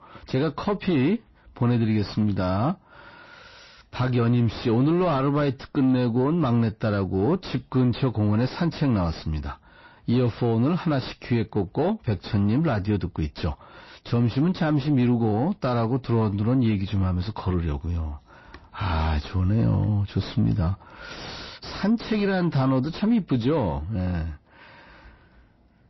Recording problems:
distortion; slight; 10 dB below the speech
garbled, watery; slightly; nothing above 5.5 kHz

